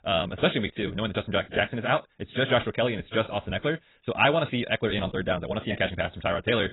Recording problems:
garbled, watery; badly; nothing above 4 kHz
wrong speed, natural pitch; too fast; 1.5 times normal speed

